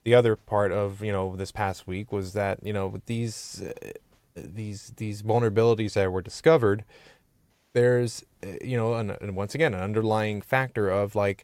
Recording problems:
none

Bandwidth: 16 kHz